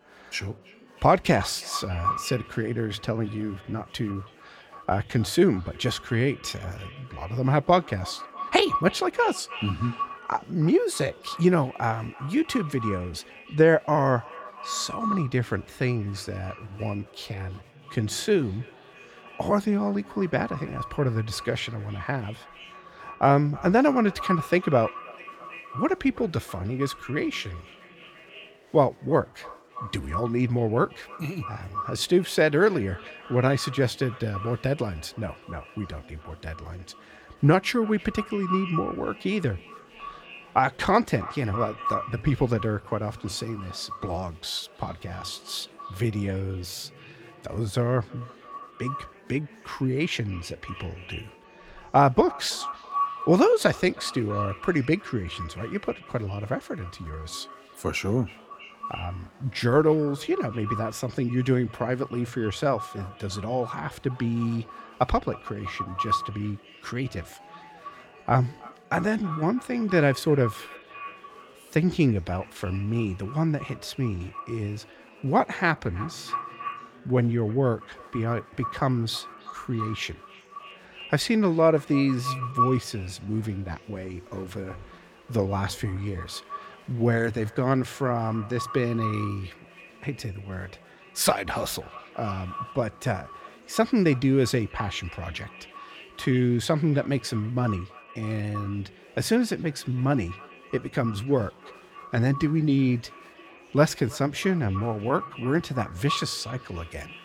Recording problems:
echo of what is said; strong; throughout; 320 ms later, 10 dB below the speech
chatter from many people; faint; throughout; 25 dB below the speech

